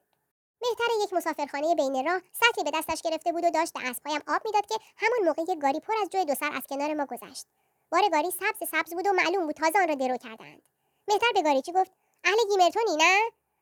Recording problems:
wrong speed and pitch; too fast and too high; 1.5 times normal speed

